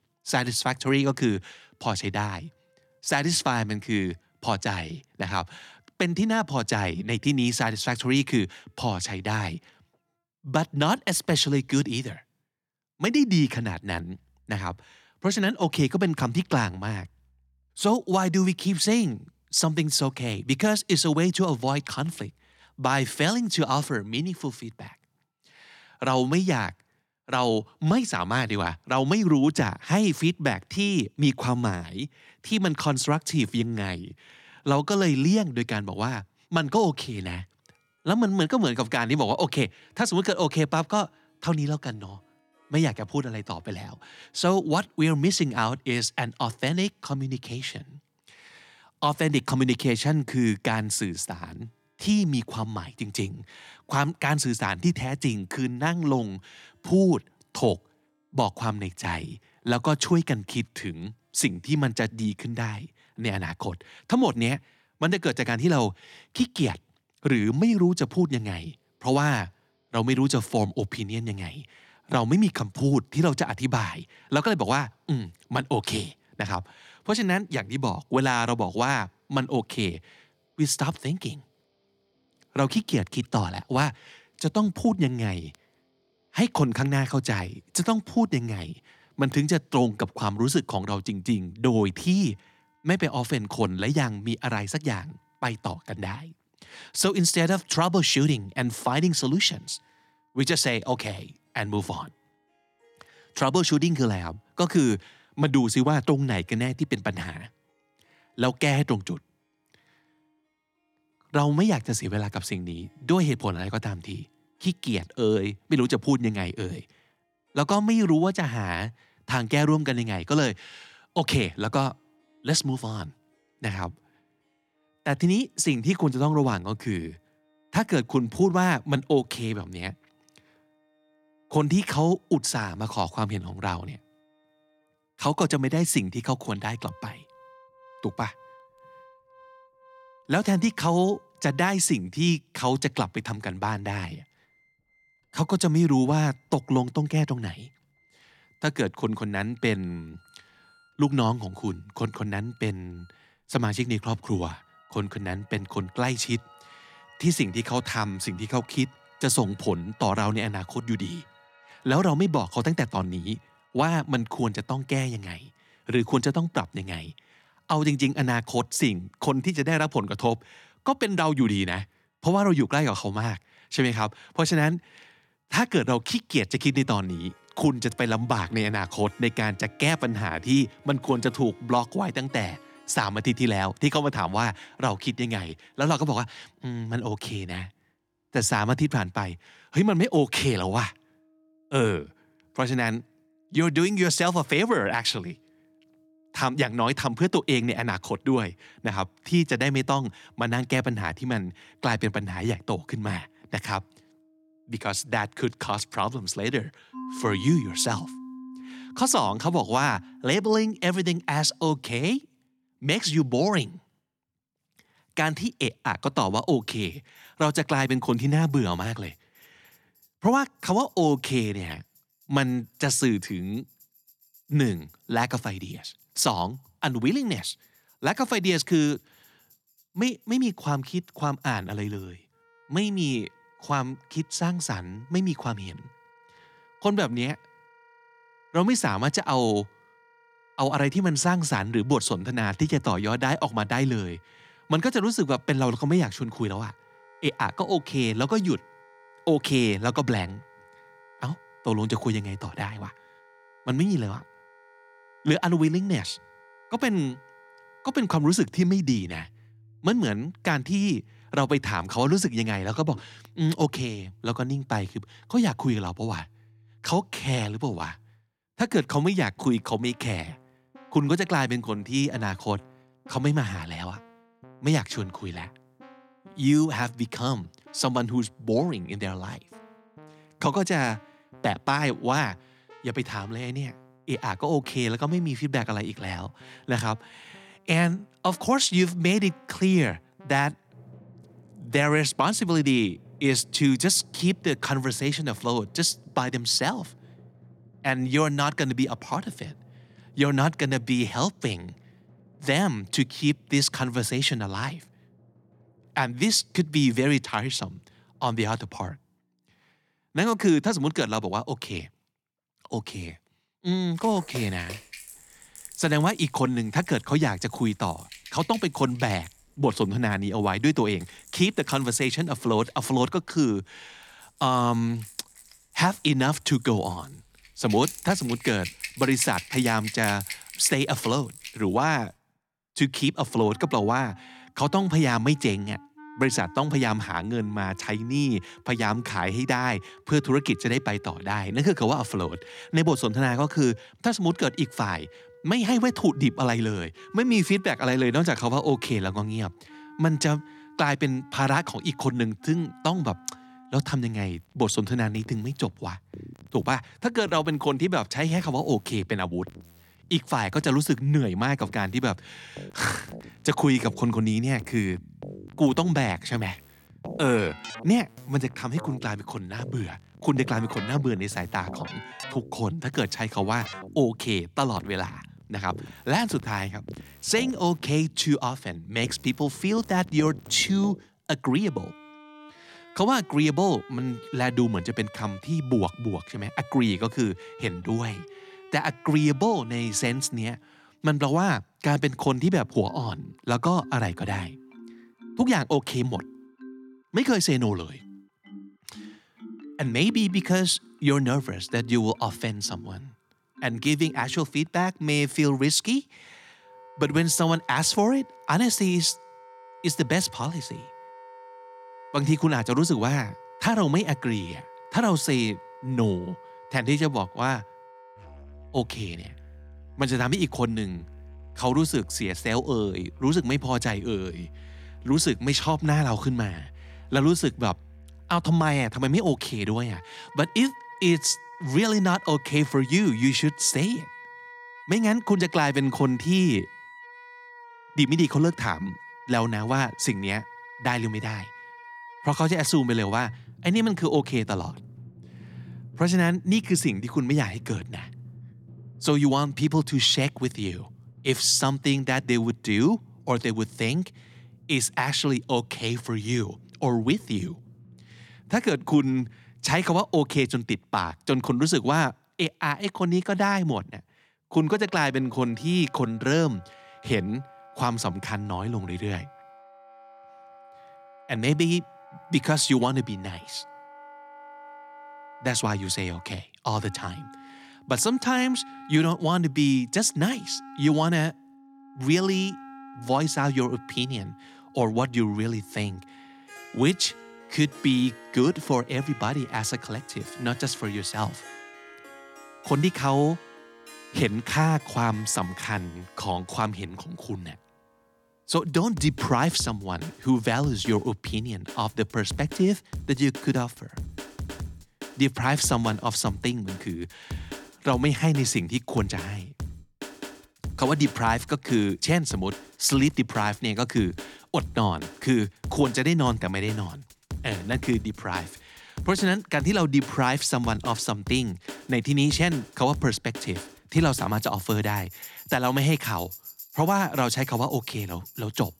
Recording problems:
background music; noticeable; throughout; 20 dB below the speech

